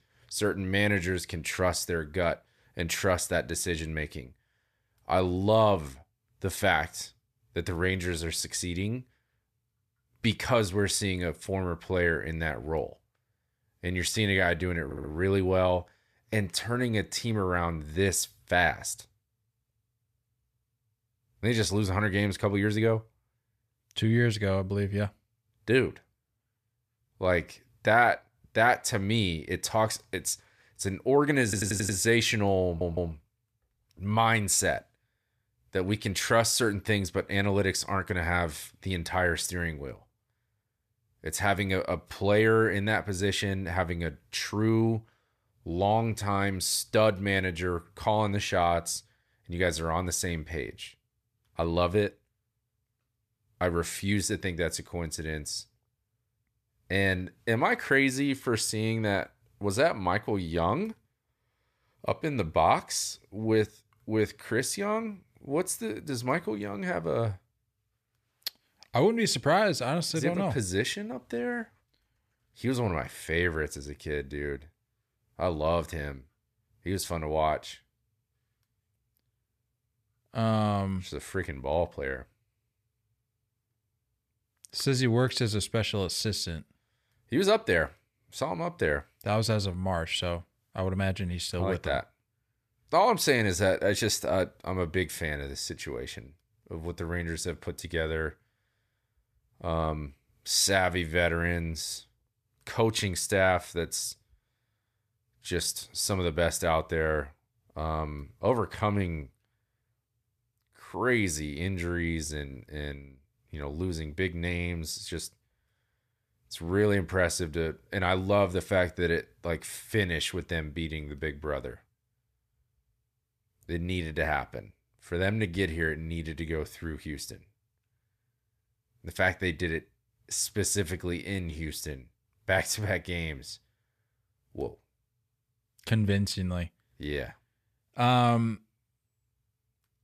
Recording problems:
audio stuttering; at 15 s, at 31 s and at 33 s

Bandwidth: 14.5 kHz